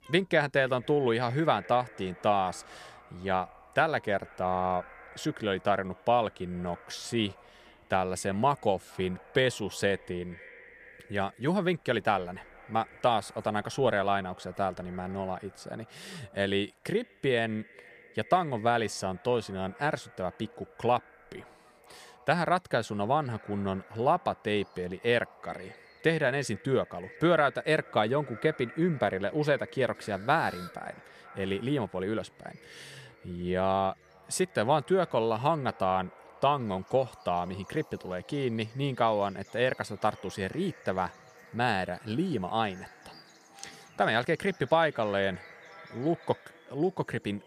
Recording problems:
echo of what is said; faint; throughout; 470 ms later, 25 dB below the speech
animal sounds; faint; throughout; 30 dB below the speech

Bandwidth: 15 kHz